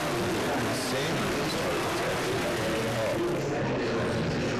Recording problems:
distortion; heavy; 5 dB below the speech
murmuring crowd; very loud; throughout; 3 dB above the speech

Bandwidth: 13.5 kHz